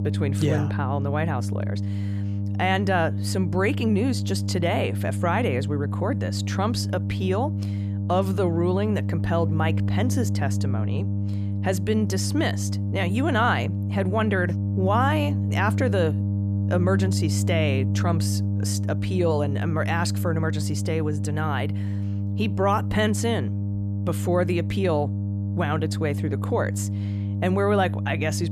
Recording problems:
electrical hum; noticeable; throughout; 50 Hz, 10 dB below the speech

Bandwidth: 14.5 kHz